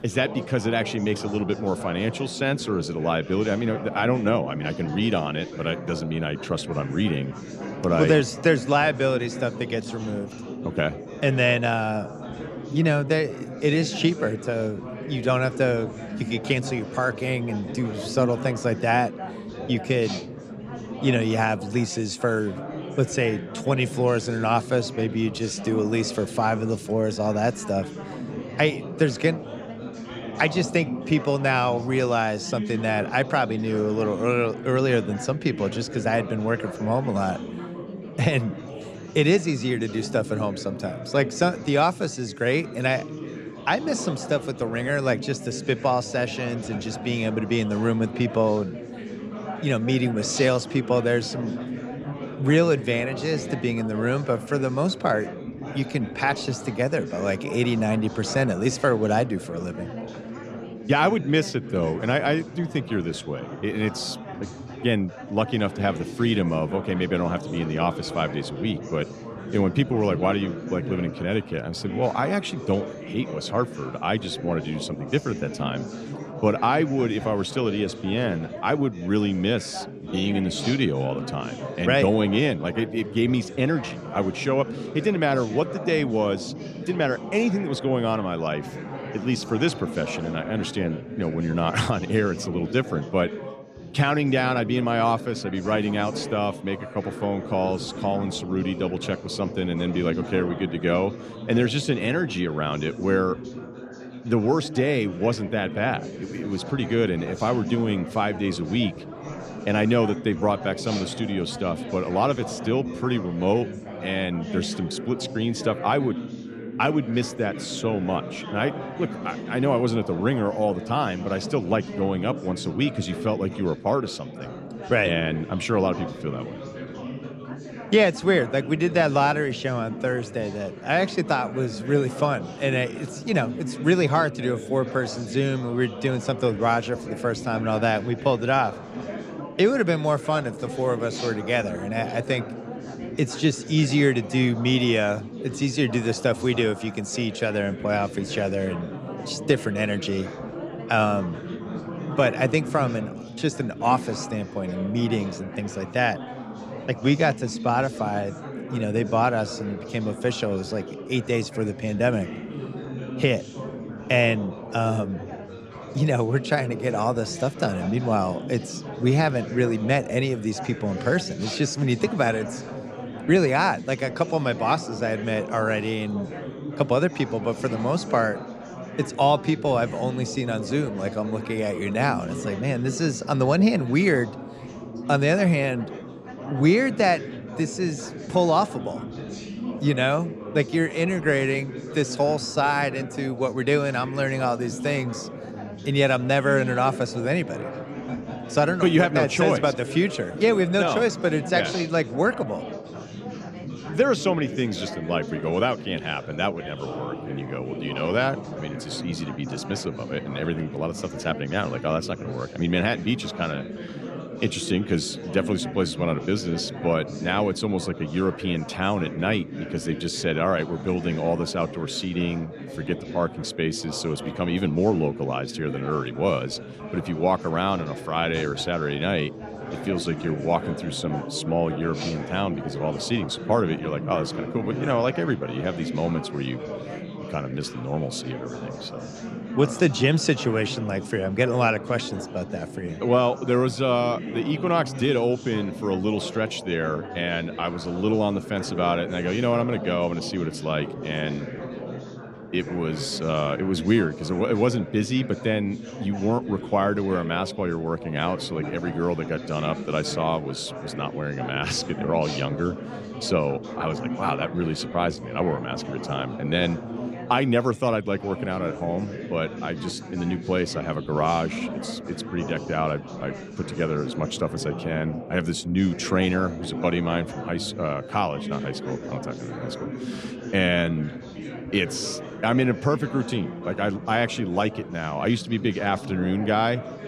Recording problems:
chatter from many people; loud; throughout; 10 dB below the speech

